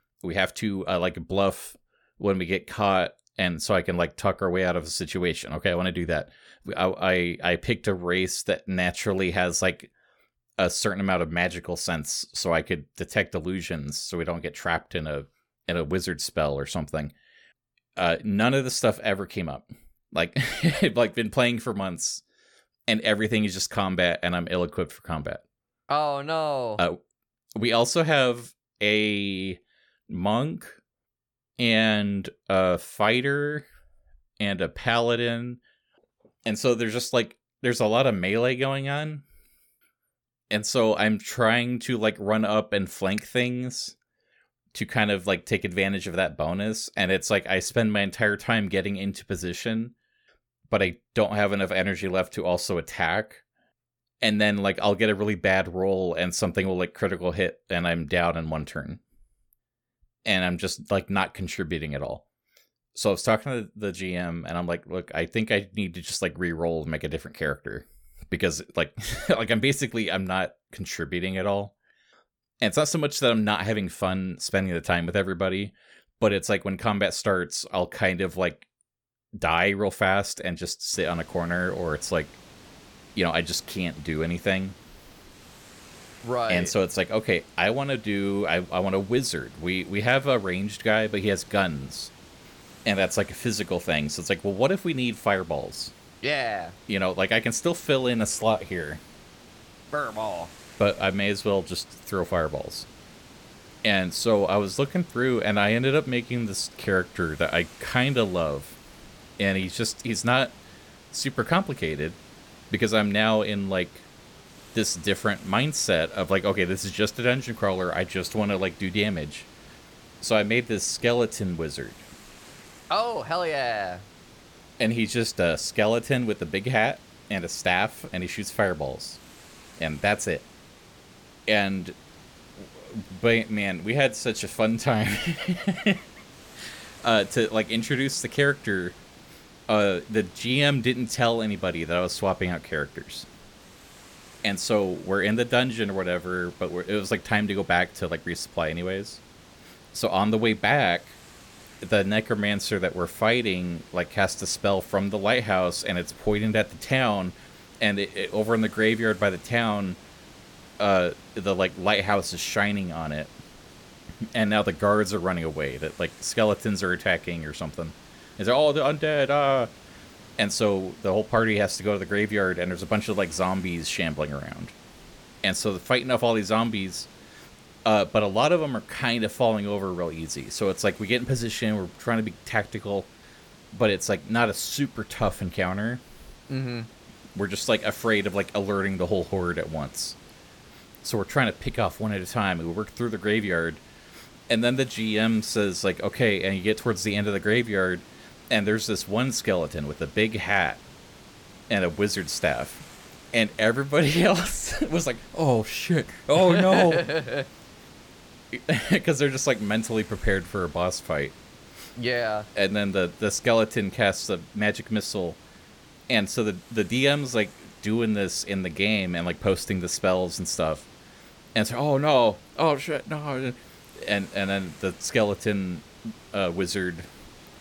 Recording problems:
hiss; faint; from 1:21 on; 25 dB below the speech

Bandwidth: 18 kHz